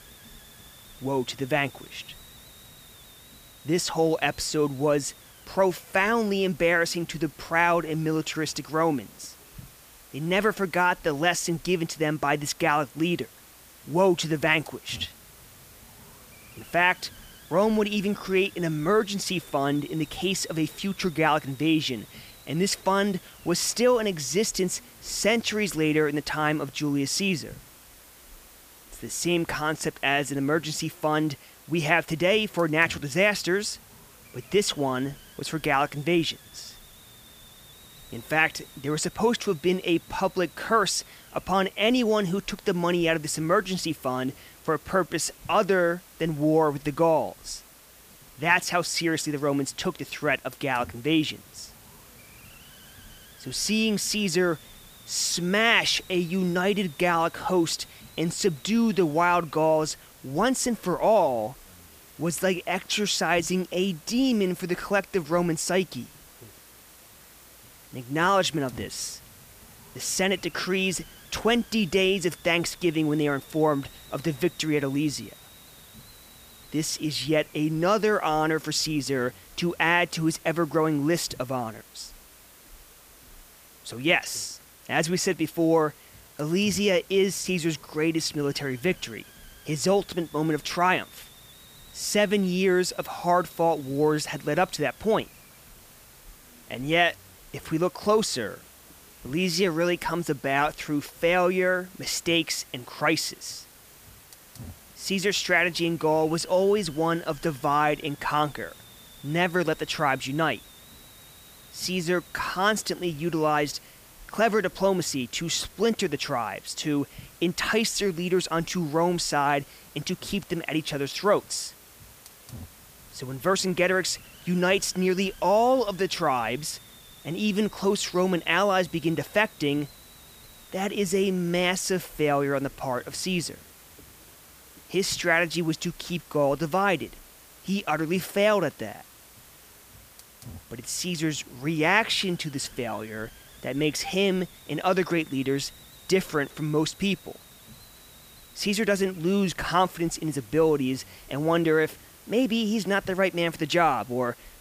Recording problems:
hiss; faint; throughout; 20 dB below the speech

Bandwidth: 15 kHz